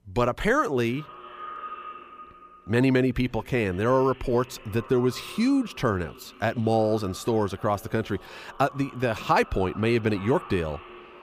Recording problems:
echo of what is said; faint; throughout; 390 ms later, 20 dB below the speech

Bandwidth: 15 kHz